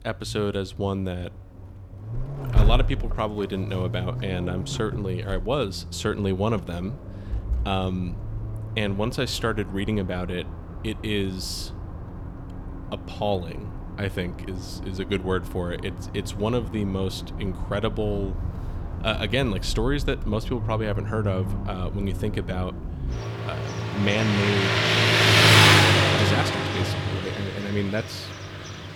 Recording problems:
traffic noise; very loud; throughout; 4 dB above the speech

